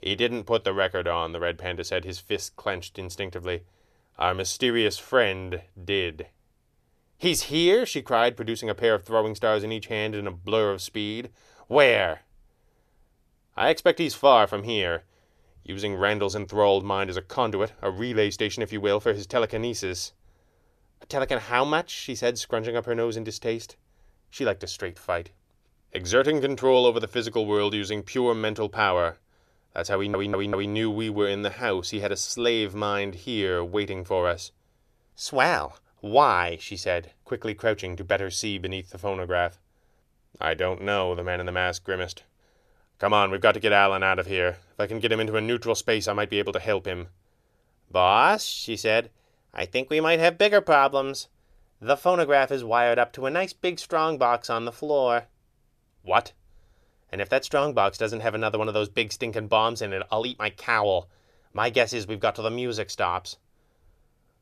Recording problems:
audio stuttering; at 30 s

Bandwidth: 14.5 kHz